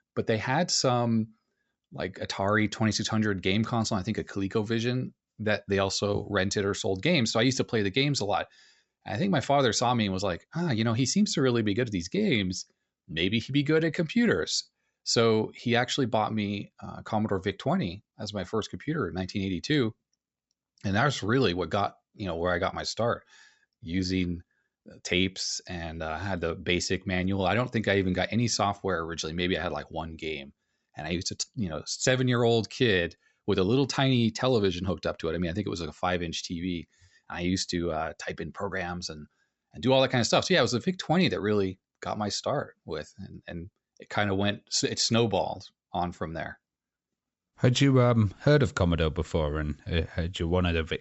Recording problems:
high frequencies cut off; noticeable; nothing above 7.5 kHz

